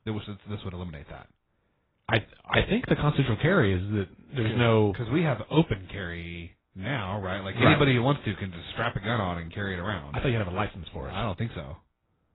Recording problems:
garbled, watery; badly; nothing above 4 kHz

